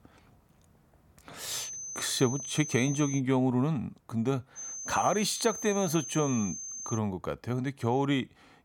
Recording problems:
high-pitched whine; loud; from 1.5 to 3 s and from 4.5 to 7 s; 6.5 kHz, 7 dB below the speech

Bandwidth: 17.5 kHz